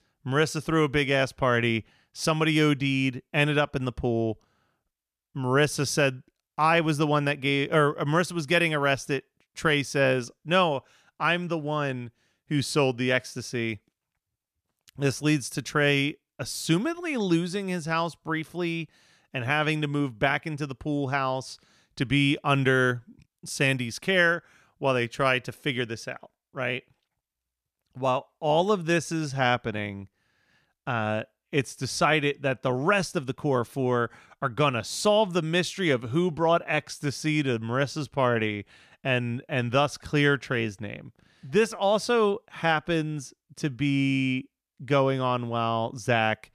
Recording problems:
none

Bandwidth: 14.5 kHz